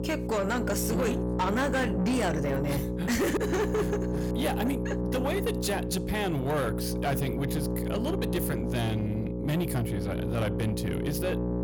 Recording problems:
distortion; slight; 10 dB below the speech
electrical hum; loud; throughout; 60 Hz, 5 dB below the speech

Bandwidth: 18 kHz